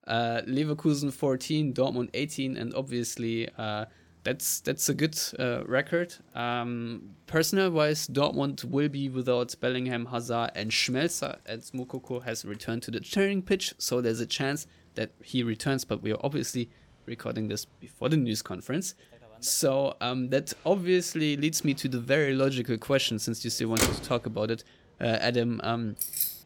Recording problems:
traffic noise; loud; throughout; 3 dB below the speech
jangling keys; loud; at 26 s; peak 1 dB above the speech

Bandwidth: 17 kHz